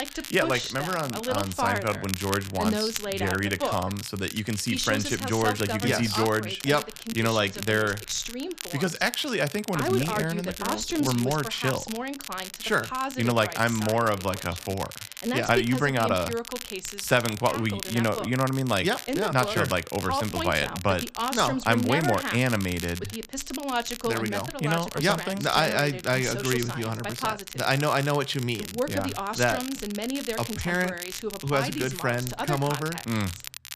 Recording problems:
voice in the background; loud; throughout; 5 dB below the speech
crackle, like an old record; noticeable; 10 dB below the speech

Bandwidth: 14.5 kHz